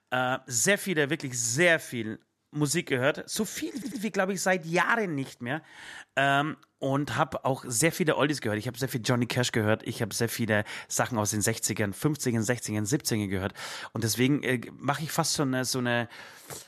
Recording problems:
audio stuttering; at 3.5 s

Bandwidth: 13.5 kHz